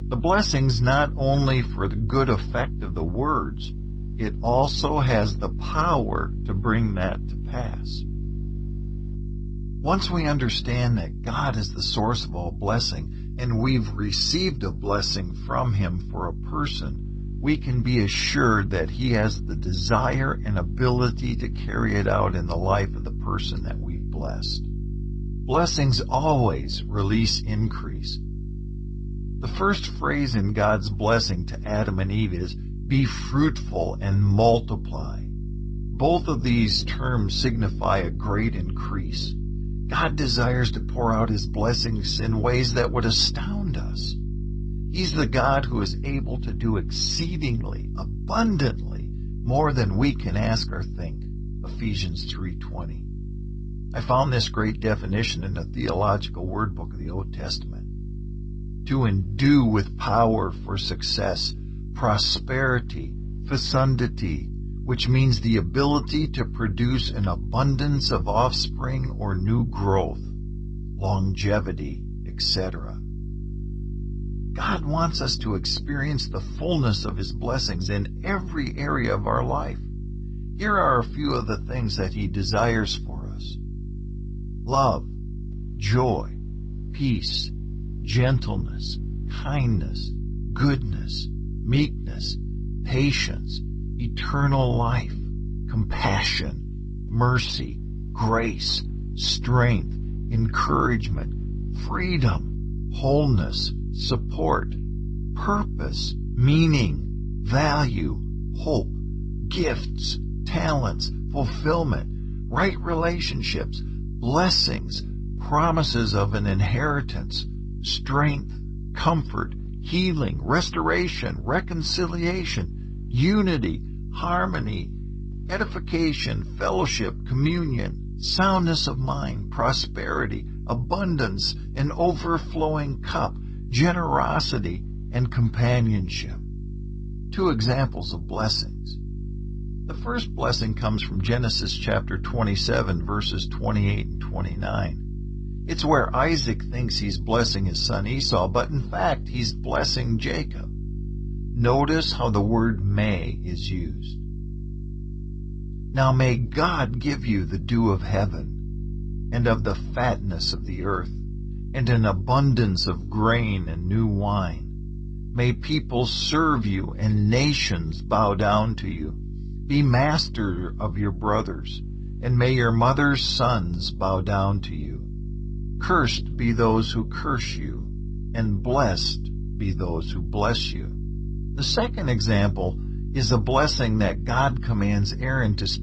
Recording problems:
garbled, watery; slightly; nothing above 8 kHz
electrical hum; noticeable; throughout; 50 Hz, 20 dB below the speech

